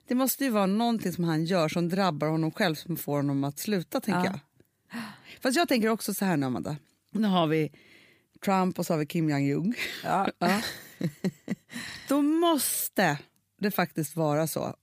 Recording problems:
none

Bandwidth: 15 kHz